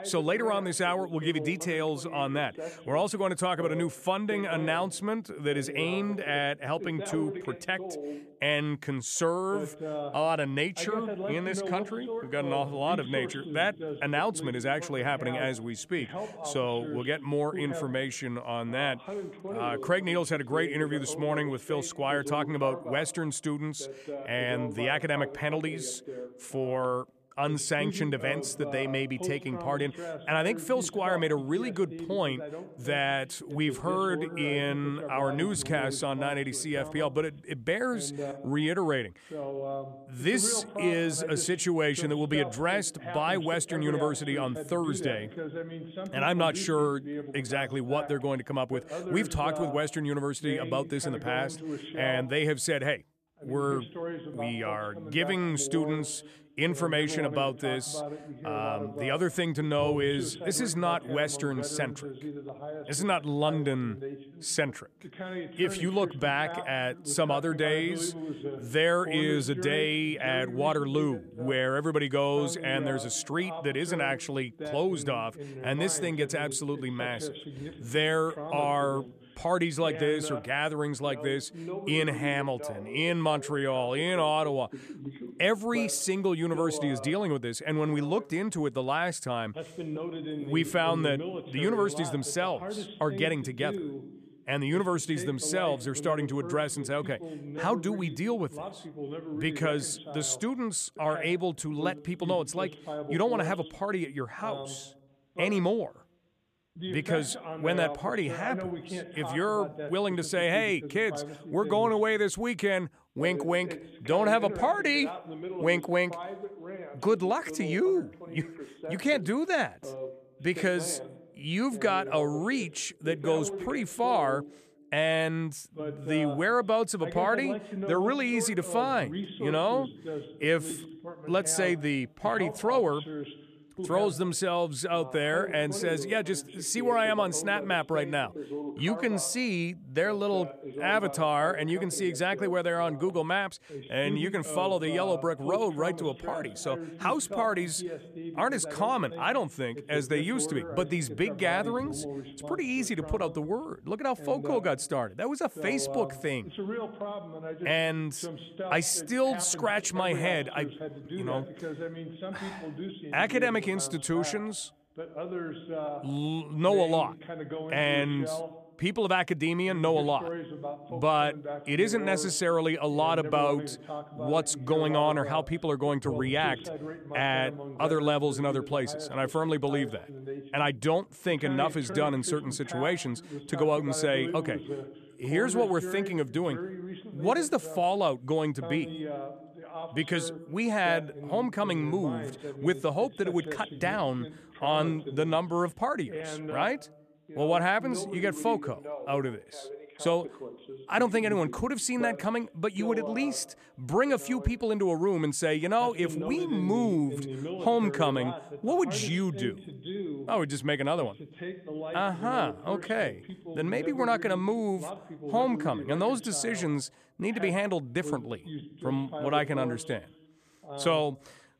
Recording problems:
voice in the background; loud; throughout; 10 dB below the speech

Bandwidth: 14.5 kHz